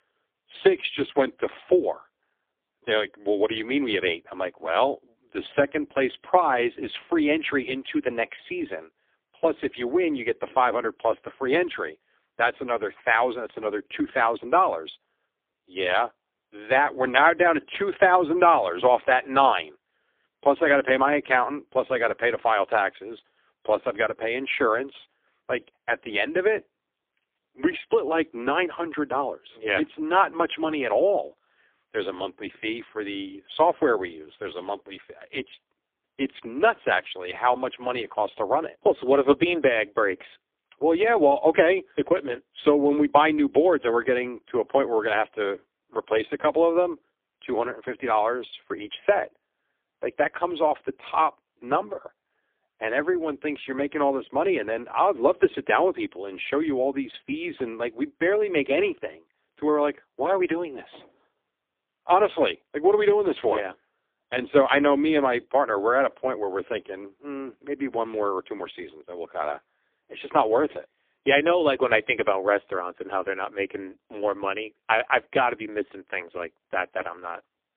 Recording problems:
phone-call audio; poor line; nothing above 3.5 kHz

